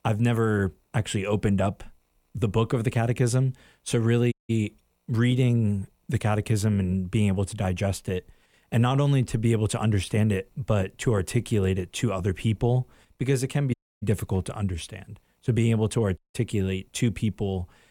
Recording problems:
audio cutting out; at 4.5 s, at 14 s and at 16 s

